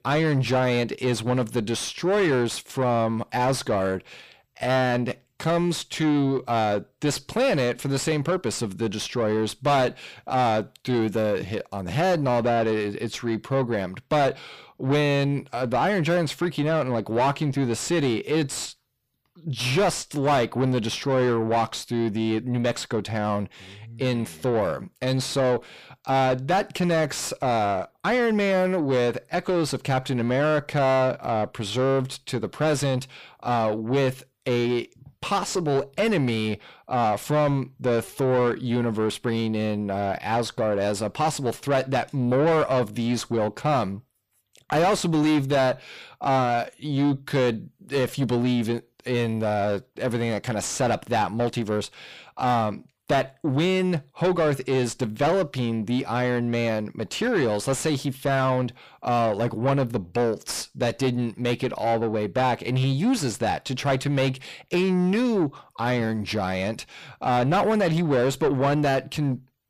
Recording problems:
distortion; heavy; 7 dB below the speech

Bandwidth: 15 kHz